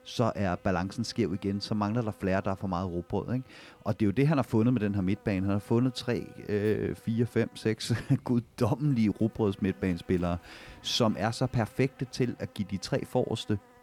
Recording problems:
electrical hum; faint; throughout; 60 Hz, 25 dB below the speech

